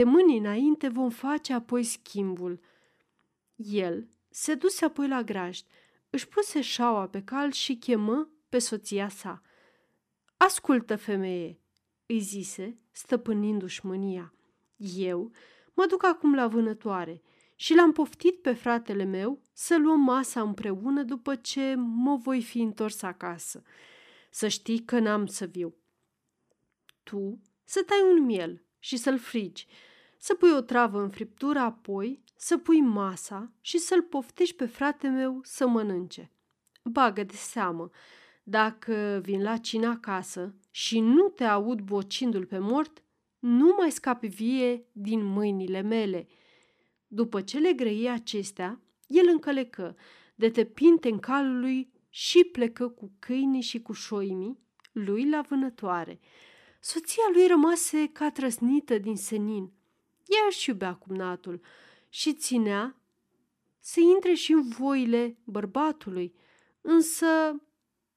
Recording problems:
abrupt cut into speech; at the start

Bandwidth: 14.5 kHz